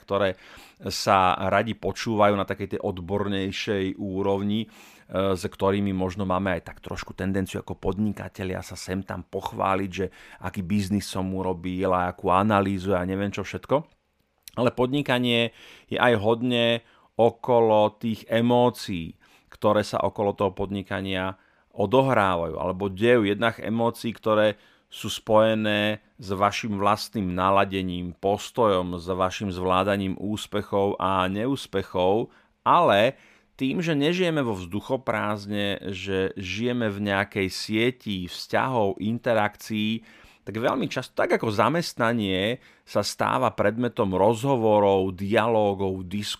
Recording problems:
none

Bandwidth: 15 kHz